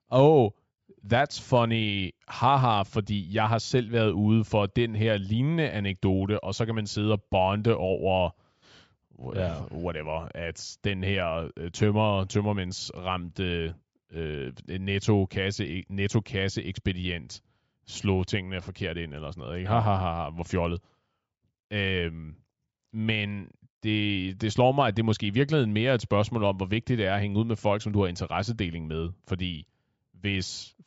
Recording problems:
high frequencies cut off; noticeable; nothing above 8 kHz

